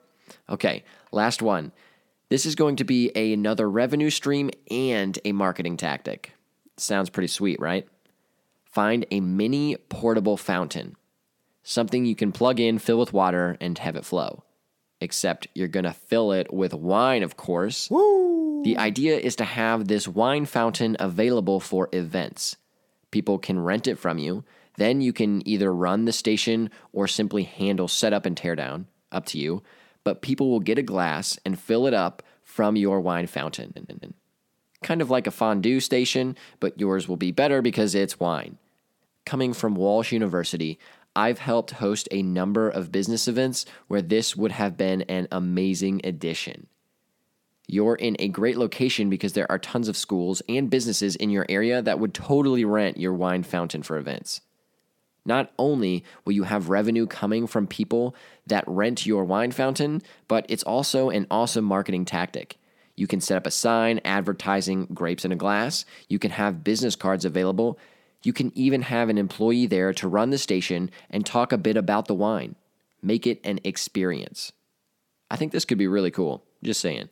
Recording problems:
audio stuttering; at 34 s

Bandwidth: 17 kHz